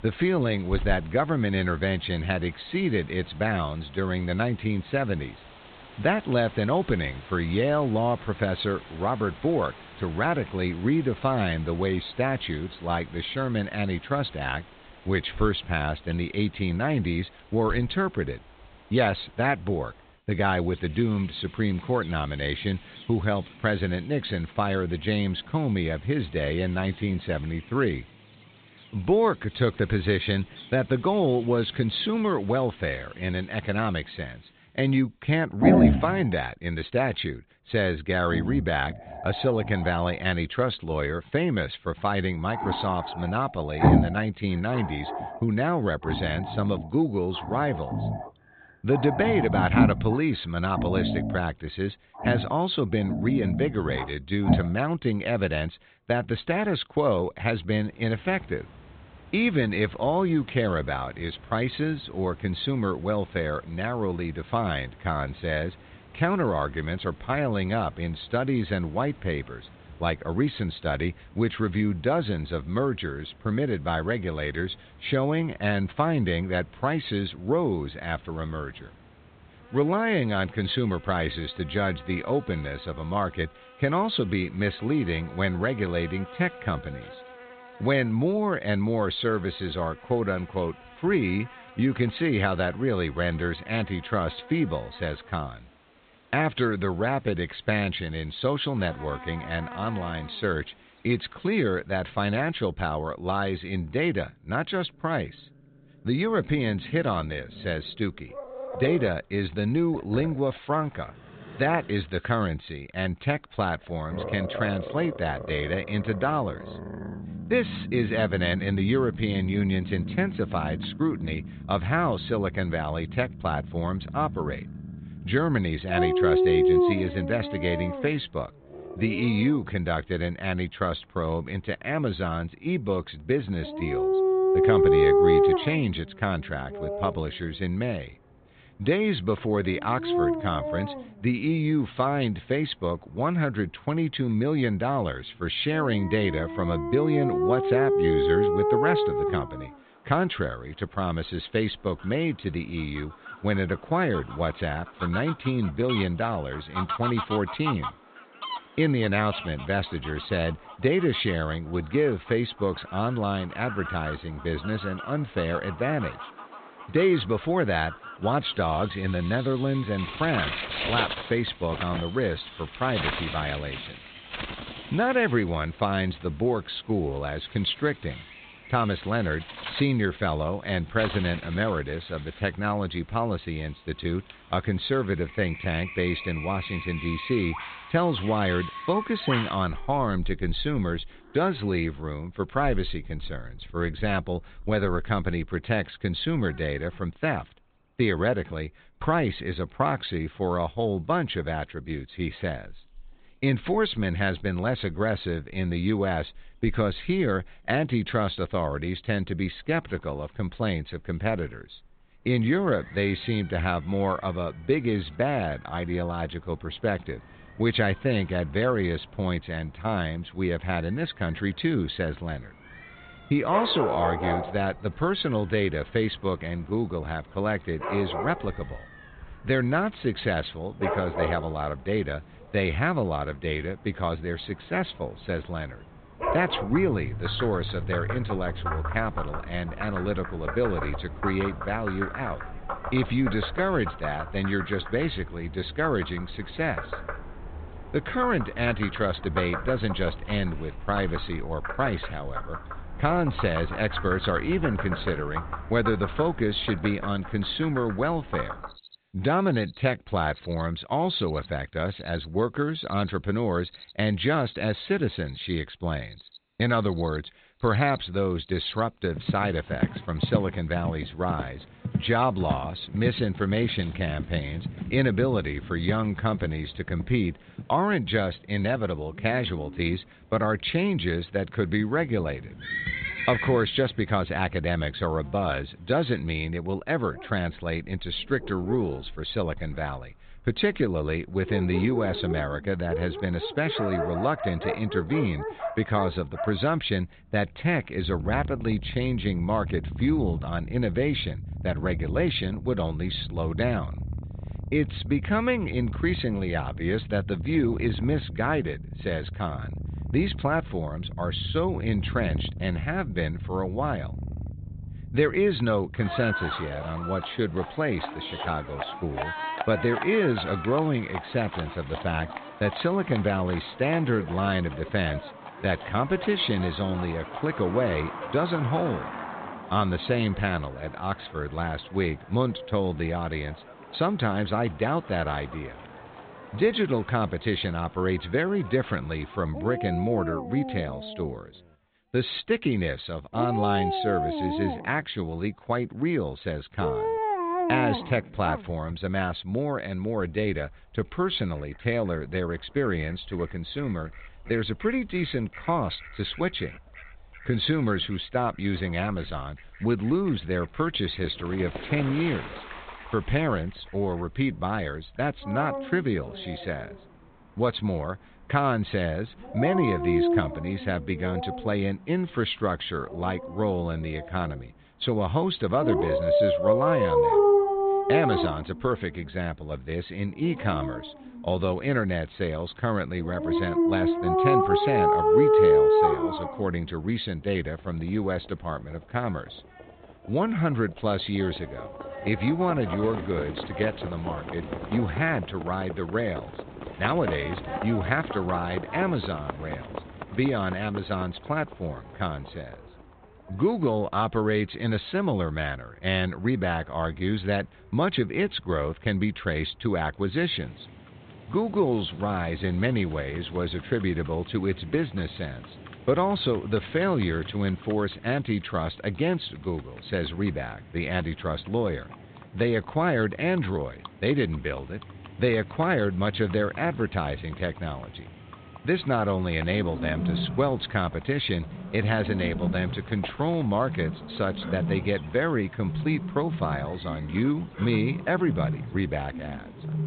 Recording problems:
high frequencies cut off; severe; nothing above 4 kHz
animal sounds; loud; throughout; 4 dB below the speech

